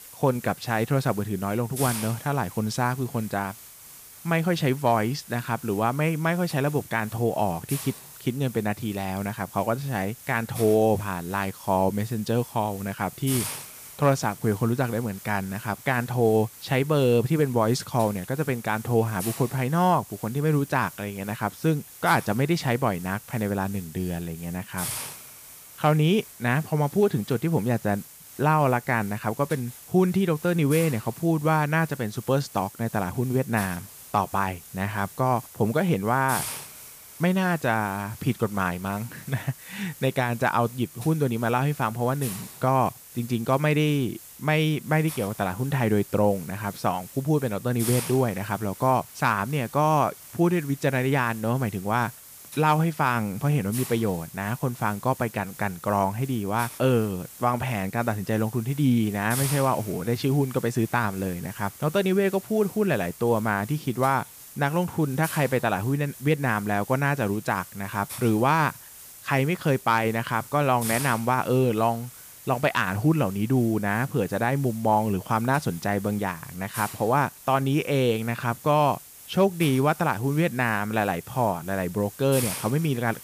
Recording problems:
hiss; noticeable; throughout; 15 dB below the speech

